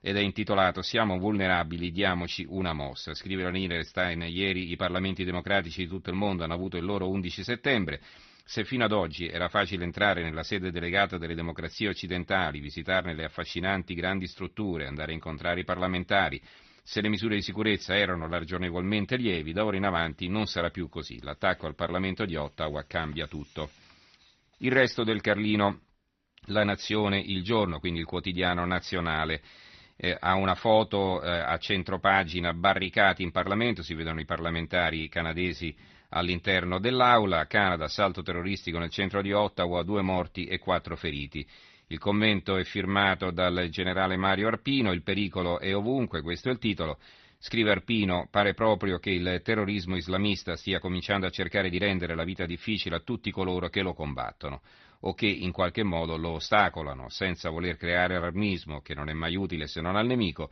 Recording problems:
garbled, watery; slightly; nothing above 6 kHz

